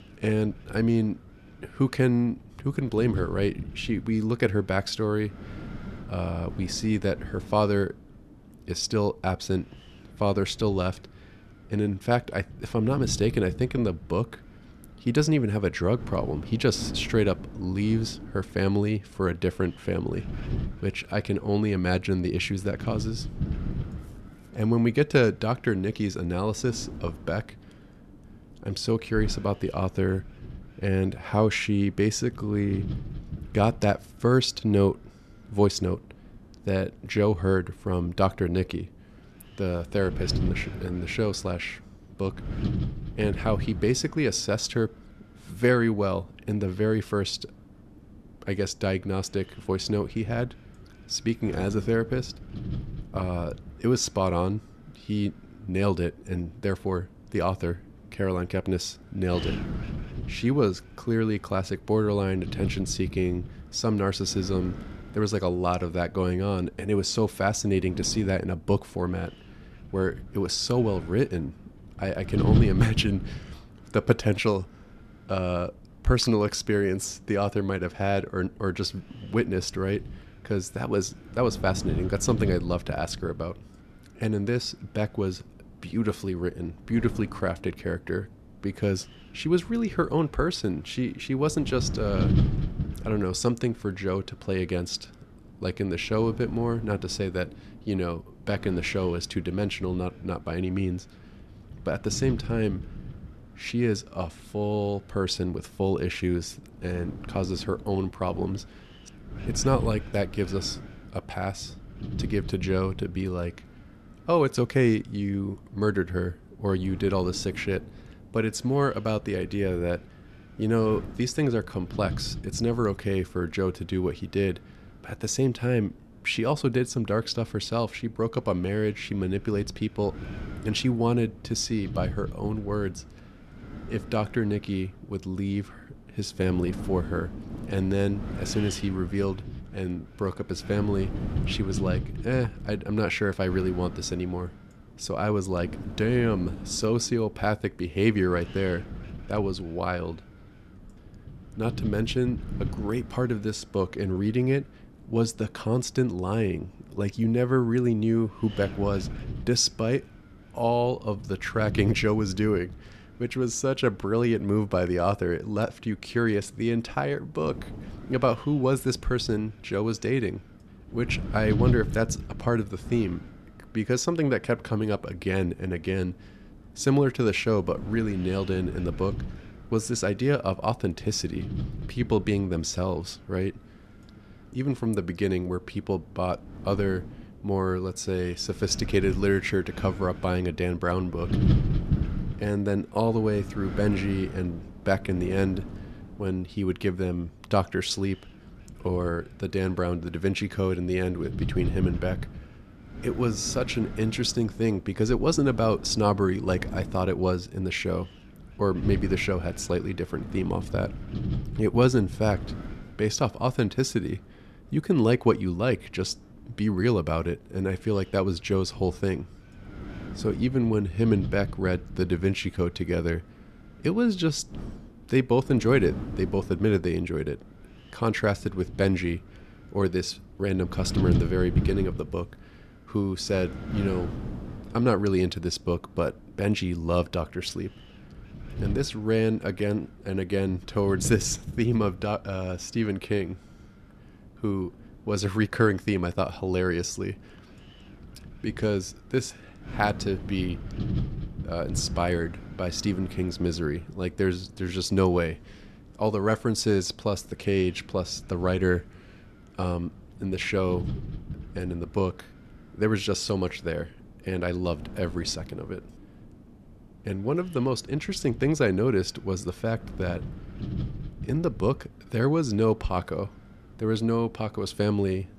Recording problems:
wind noise on the microphone; occasional gusts; 15 dB below the speech

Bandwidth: 13.5 kHz